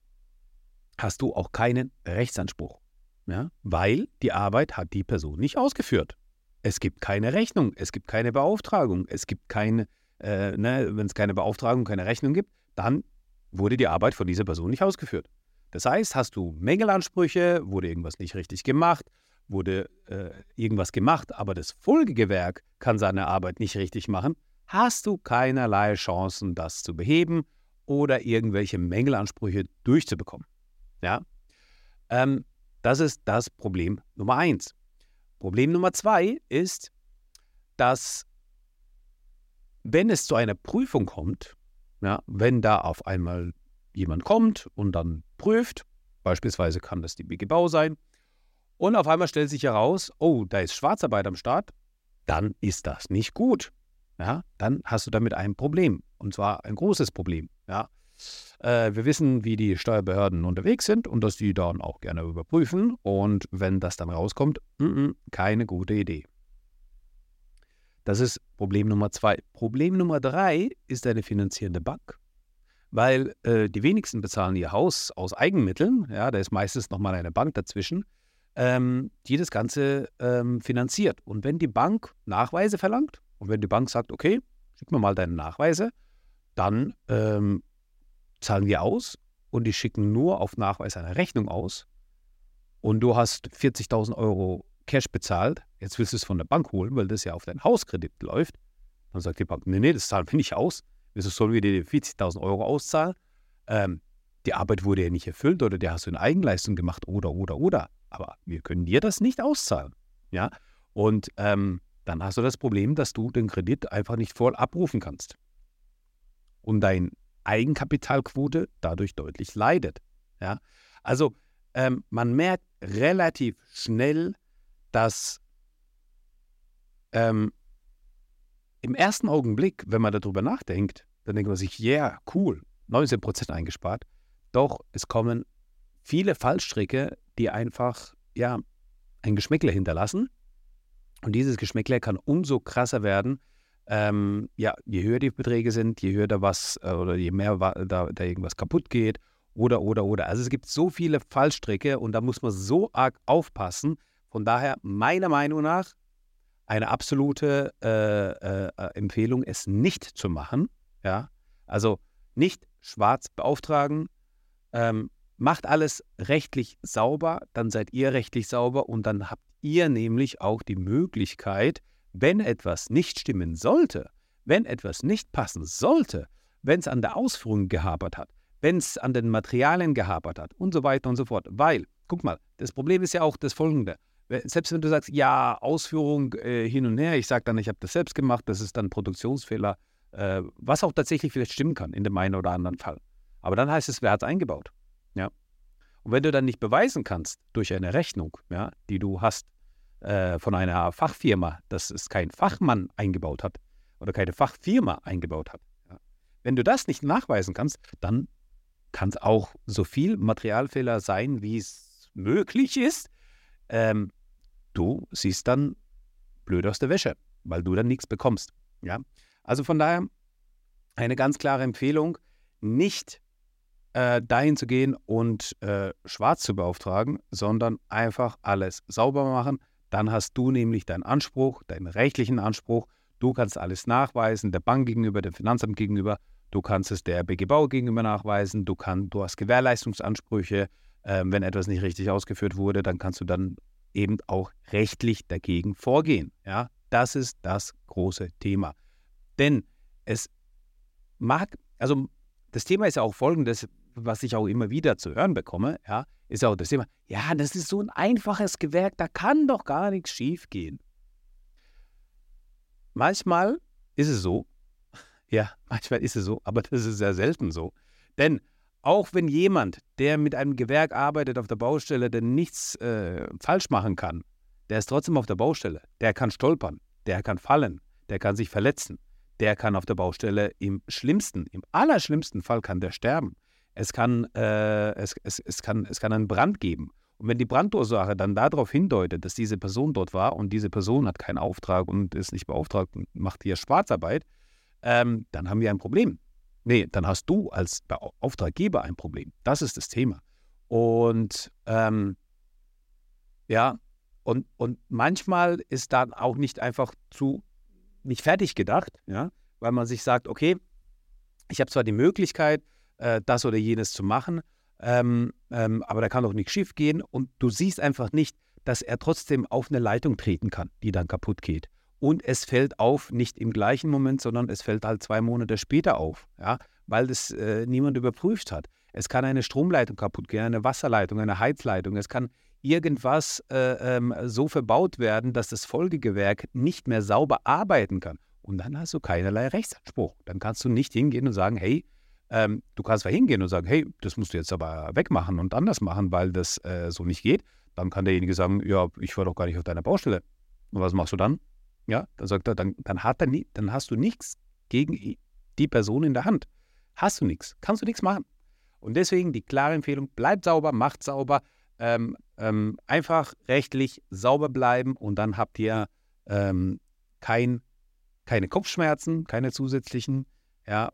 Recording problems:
none

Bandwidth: 16 kHz